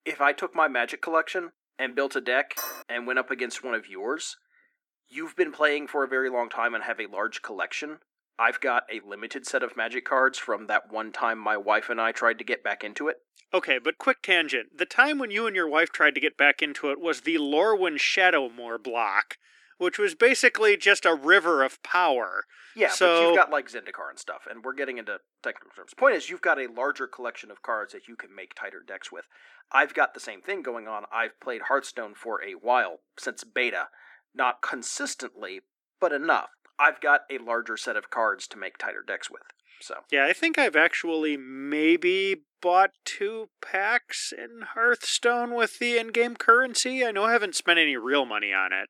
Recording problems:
thin; somewhat; fading below 300 Hz
clattering dishes; noticeable; at 2.5 s; peak 9 dB below the speech

